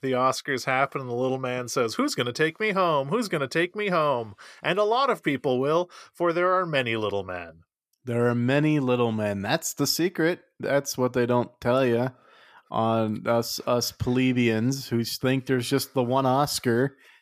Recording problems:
none

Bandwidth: 14.5 kHz